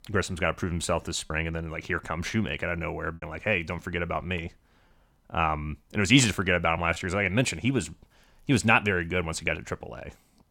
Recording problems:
choppy; occasionally; 2% of the speech affected

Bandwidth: 17 kHz